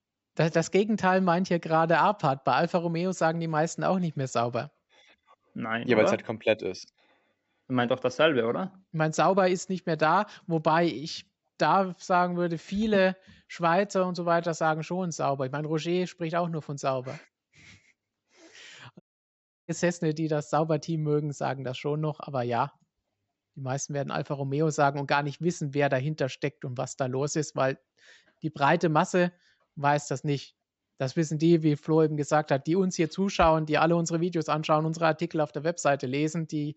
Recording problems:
high frequencies cut off; noticeable; nothing above 7.5 kHz
audio cutting out; at 19 s for 0.5 s

